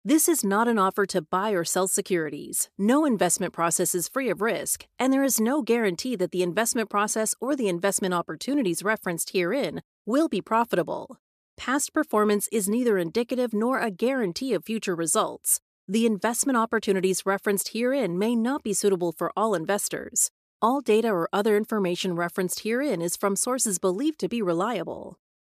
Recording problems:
none

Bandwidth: 14.5 kHz